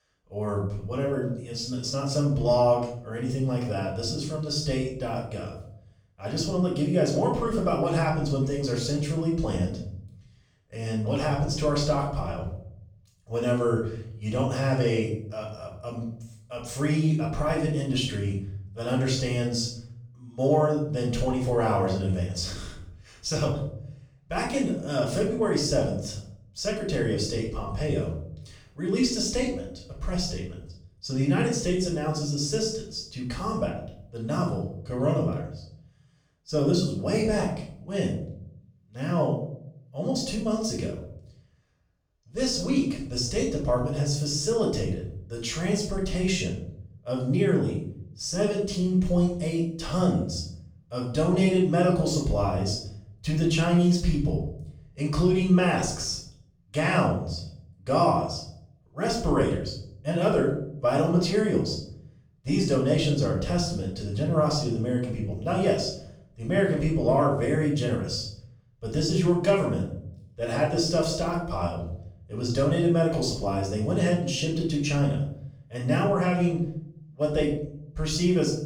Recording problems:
off-mic speech; far
room echo; noticeable; dies away in 0.6 s

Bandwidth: 18 kHz